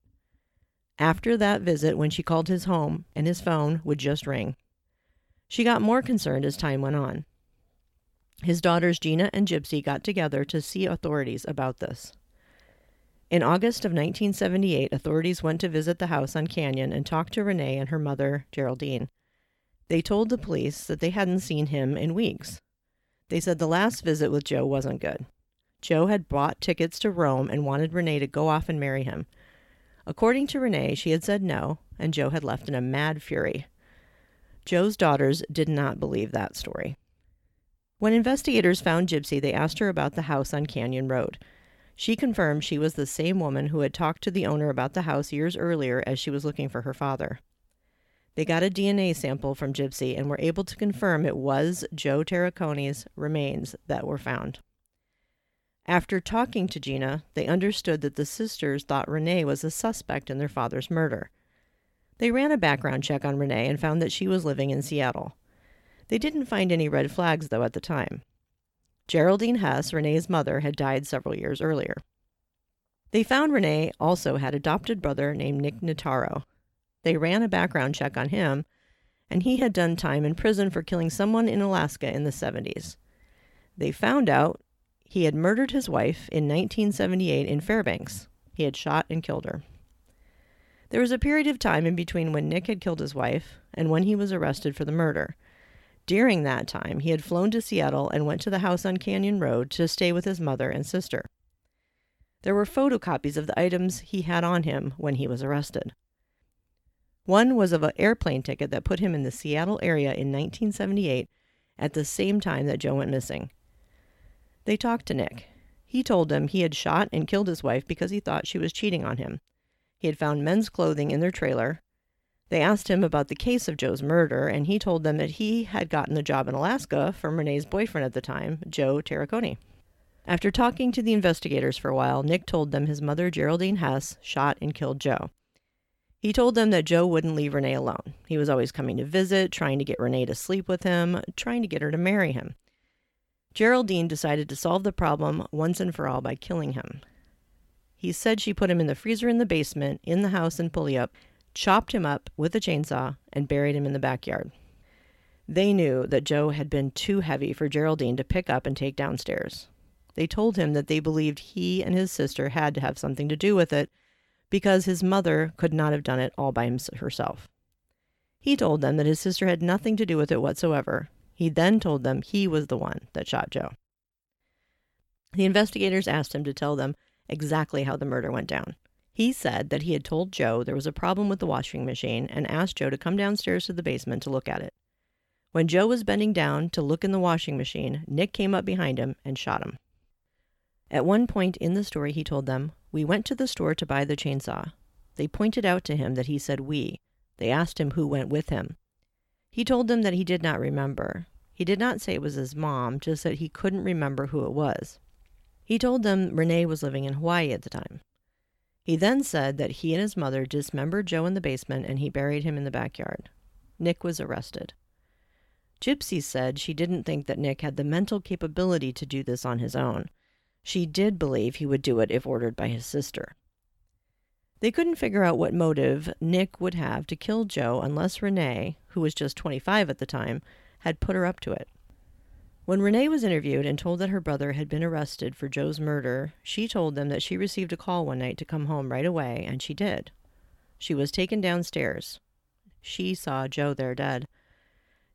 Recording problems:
none

